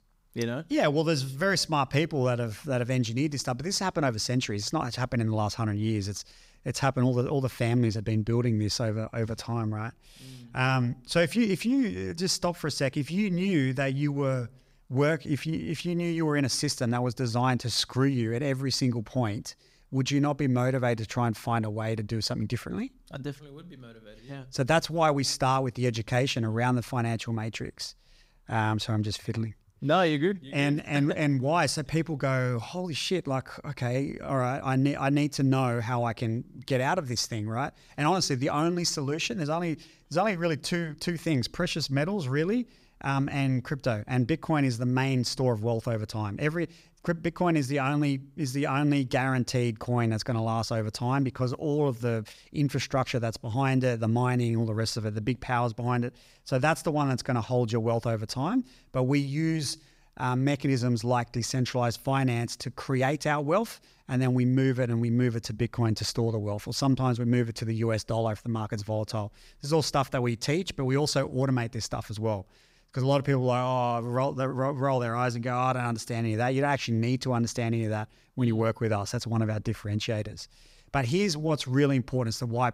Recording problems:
none

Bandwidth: 15.5 kHz